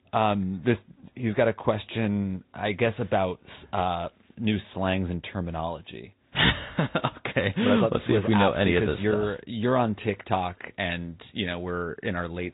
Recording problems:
high frequencies cut off; severe; nothing above 4 kHz
garbled, watery; slightly

